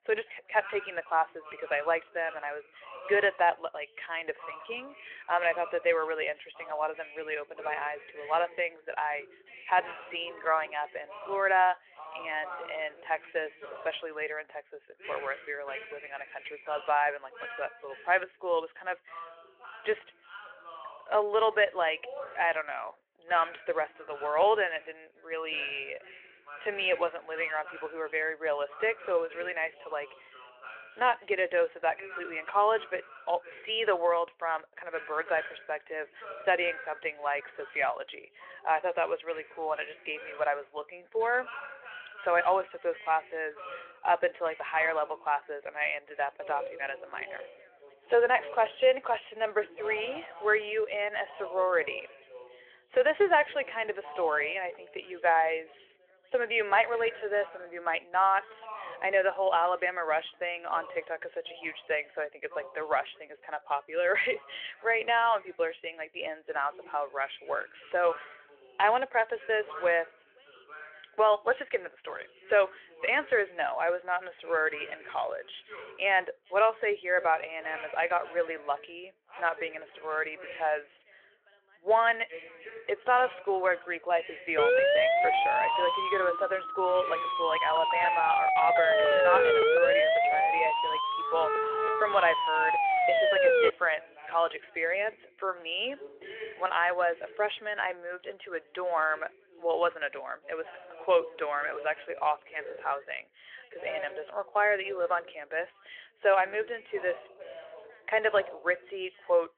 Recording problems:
phone-call audio
background chatter; noticeable; throughout; 2 voices, 15 dB below the speech
siren; loud; from 1:25 to 1:34; peak 7 dB above the speech

